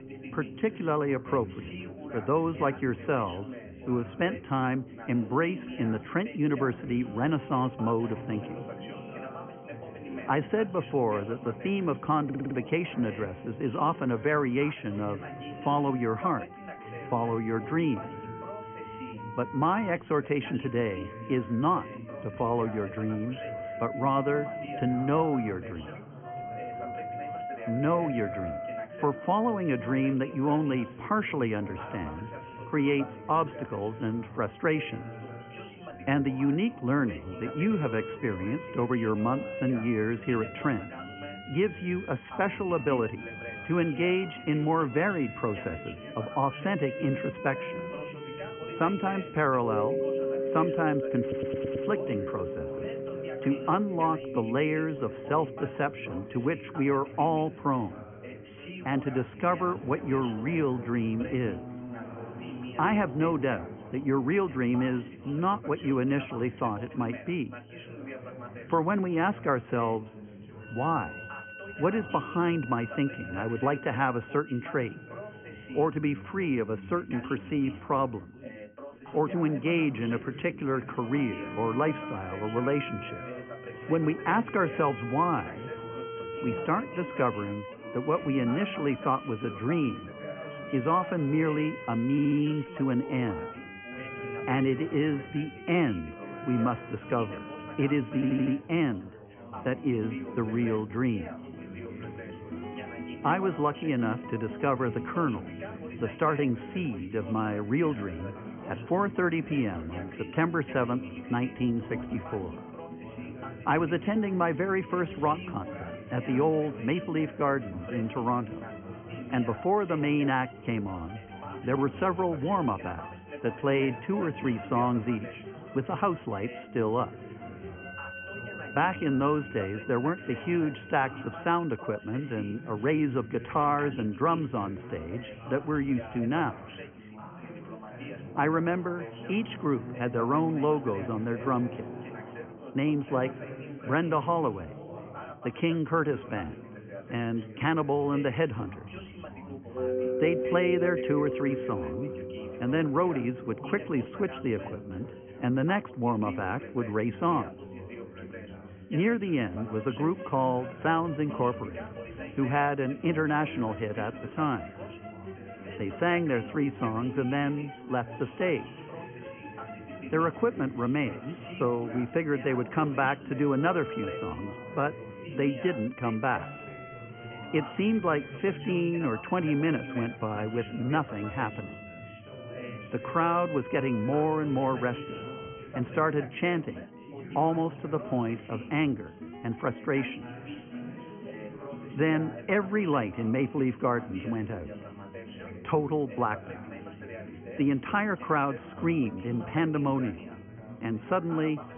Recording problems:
high frequencies cut off; severe; nothing above 3 kHz
background music; noticeable; throughout; 10 dB below the speech
background chatter; noticeable; throughout; 3 voices, 15 dB below the speech
audio stuttering; 4 times, first at 12 s

